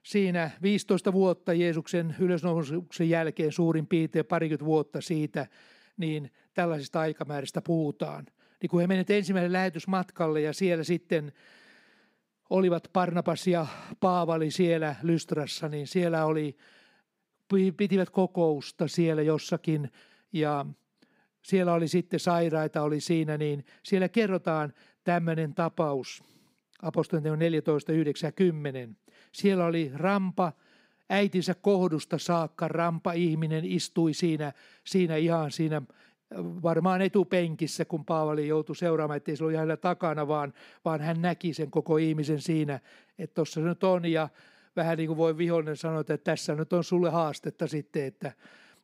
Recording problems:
none

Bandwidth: 15.5 kHz